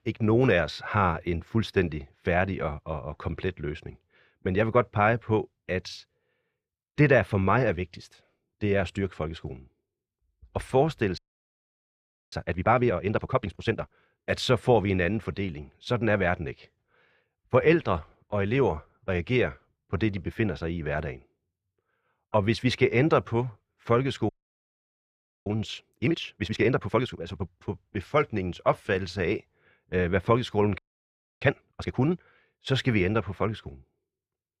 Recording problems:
audio freezing; at 11 s for 1 s, at 24 s for 1 s and at 31 s for 0.5 s

